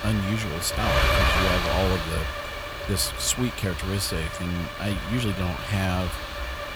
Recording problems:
wind noise on the microphone; heavy; 3 dB above the speech
train or aircraft noise; faint; throughout; 20 dB below the speech
hiss; faint; throughout; 25 dB below the speech
uneven, jittery; strongly; from 1 to 6 s

